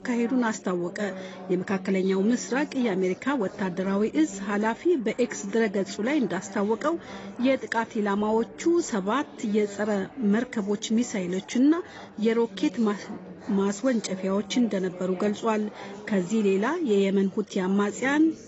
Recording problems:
garbled, watery; badly; nothing above 7.5 kHz
chatter from many people; noticeable; throughout; 15 dB below the speech

